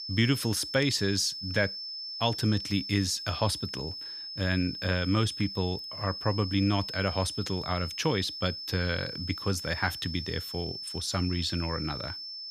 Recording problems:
high-pitched whine; loud; throughout; 5.5 kHz, 6 dB below the speech

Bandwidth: 15 kHz